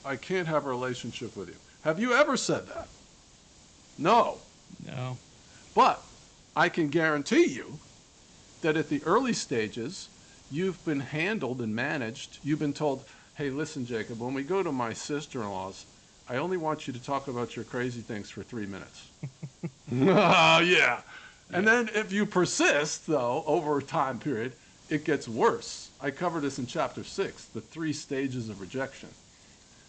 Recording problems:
high frequencies cut off; noticeable; nothing above 8 kHz
hiss; faint; throughout; 25 dB below the speech

